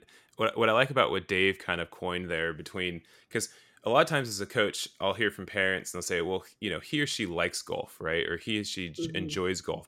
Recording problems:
none

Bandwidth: 16.5 kHz